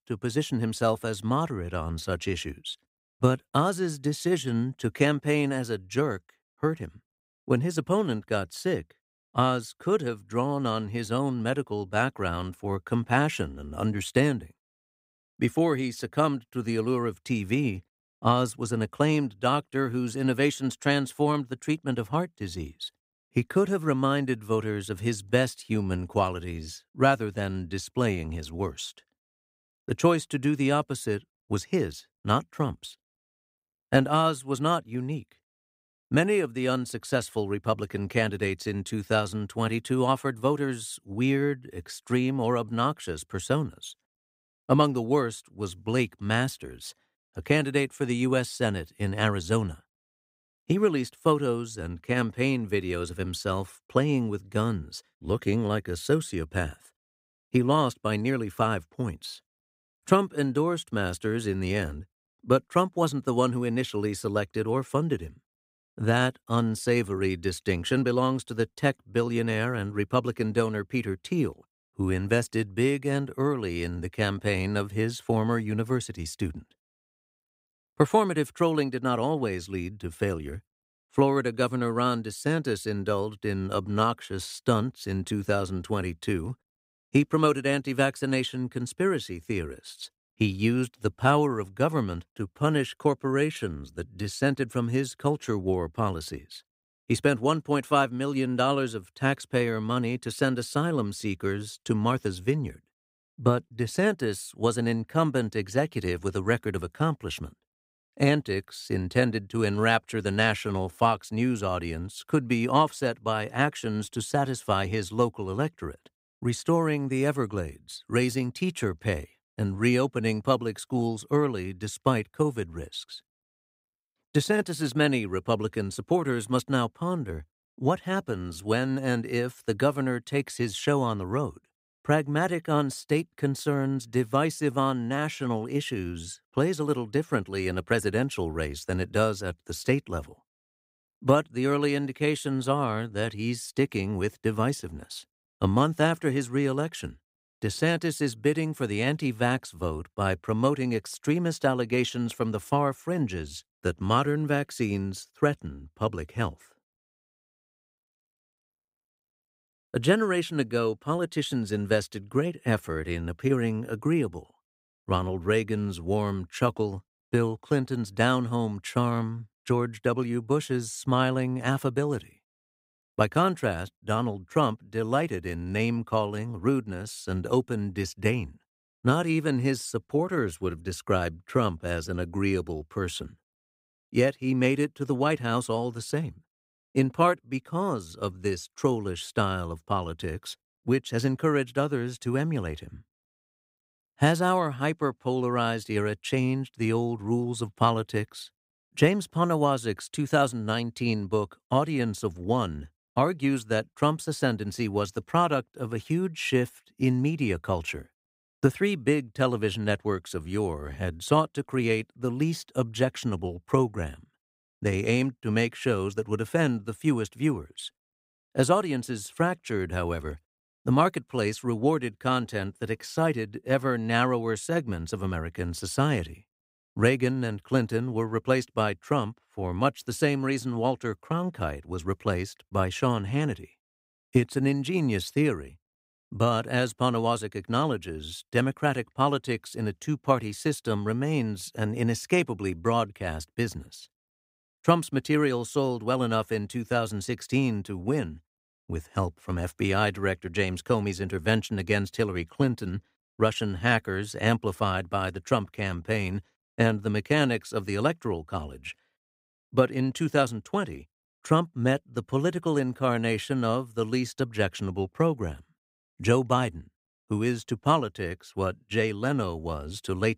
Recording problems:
none

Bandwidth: 15.5 kHz